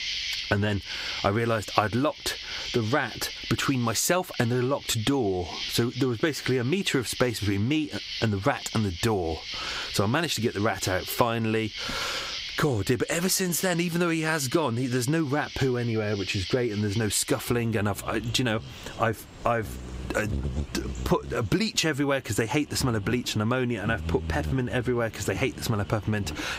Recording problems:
squashed, flat; heavily, background pumping
animal sounds; loud; throughout; 10 dB below the speech

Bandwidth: 15.5 kHz